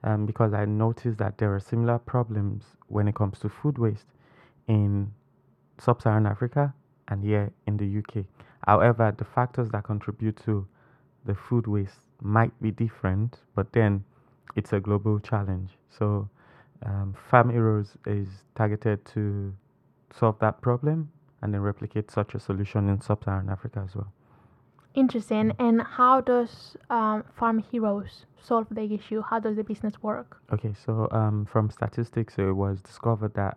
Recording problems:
muffled; very; fading above 2.5 kHz

